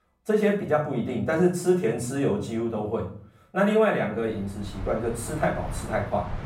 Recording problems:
off-mic speech; far
room echo; slight; dies away in 0.5 s
train or aircraft noise; noticeable; from 4.5 s on; 15 dB below the speech

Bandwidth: 16 kHz